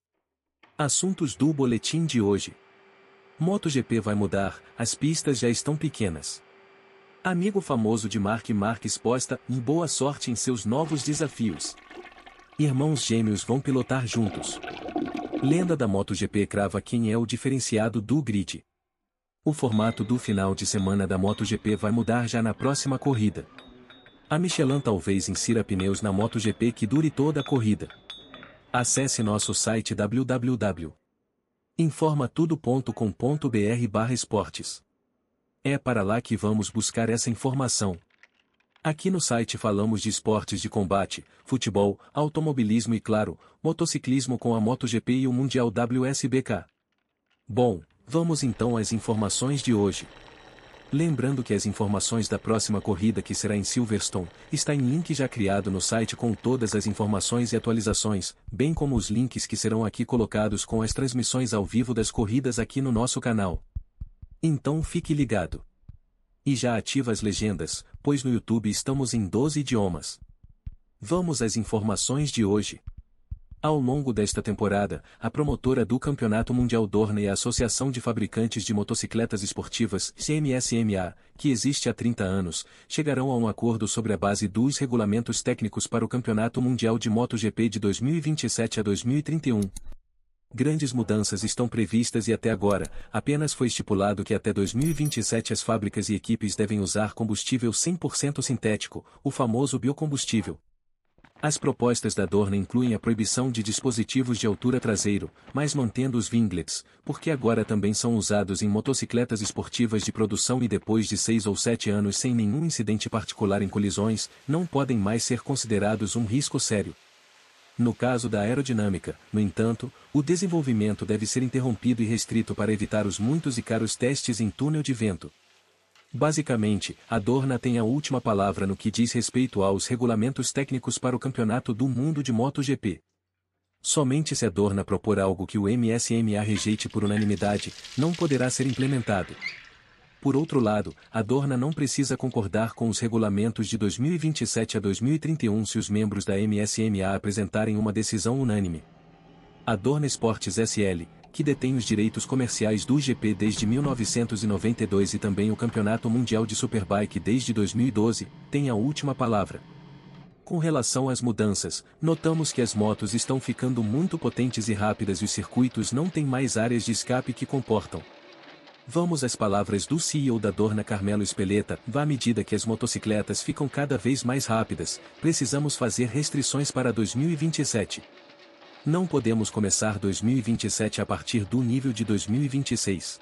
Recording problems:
household noises; noticeable; throughout; 20 dB below the speech

